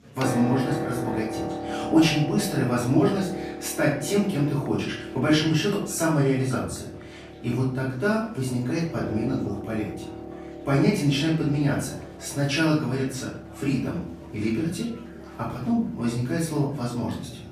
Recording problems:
off-mic speech; far
room echo; noticeable; dies away in 0.5 s
background music; noticeable; throughout; 10 dB below the speech
murmuring crowd; faint; throughout; 25 dB below the speech

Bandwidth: 14.5 kHz